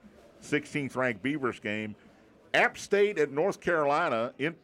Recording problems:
murmuring crowd; faint; throughout; 30 dB below the speech

